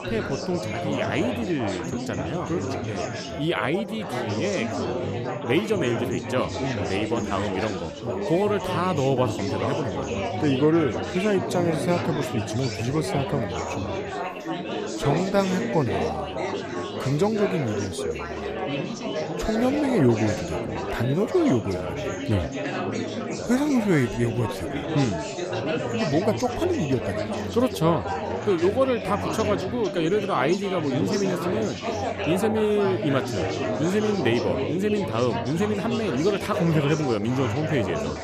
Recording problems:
chatter from many people; loud; throughout; 3 dB below the speech

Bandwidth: 15 kHz